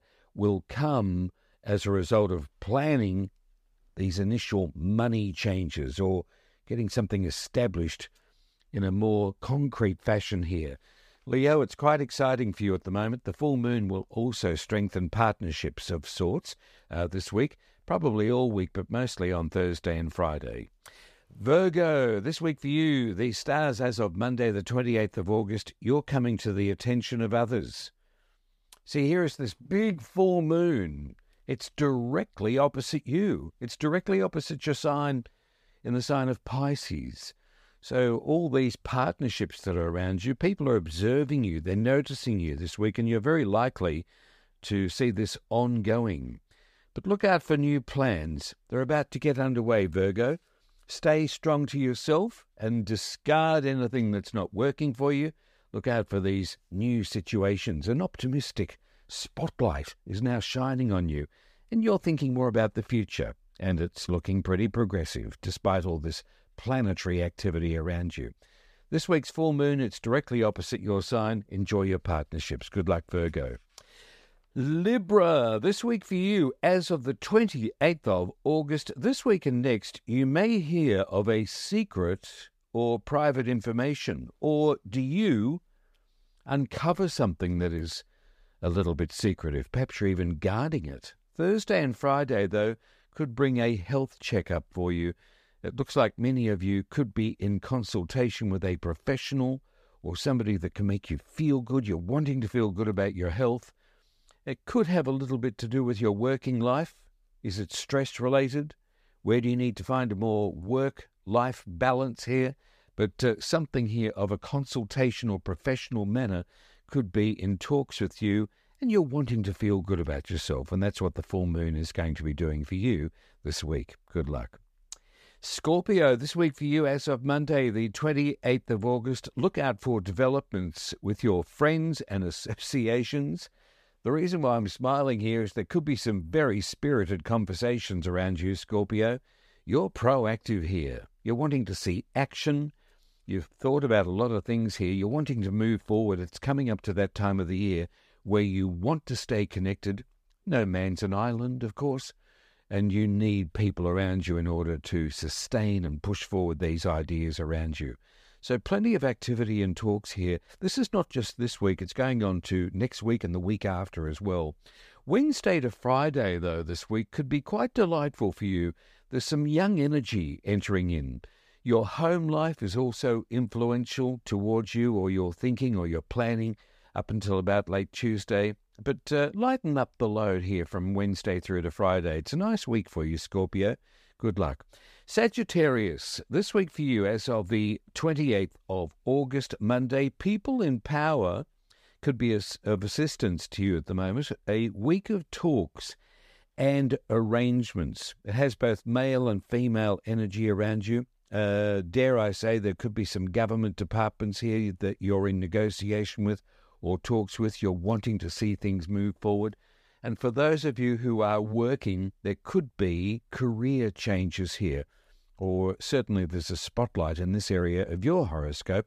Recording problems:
none

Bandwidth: 15 kHz